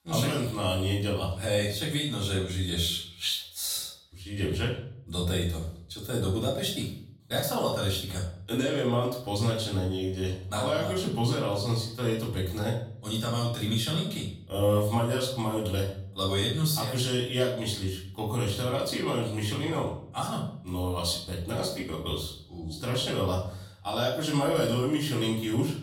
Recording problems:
off-mic speech; far
room echo; noticeable; dies away in 0.5 s

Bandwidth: 16.5 kHz